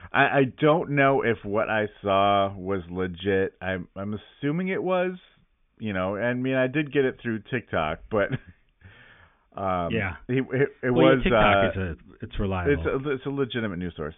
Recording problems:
high frequencies cut off; severe; nothing above 3.5 kHz

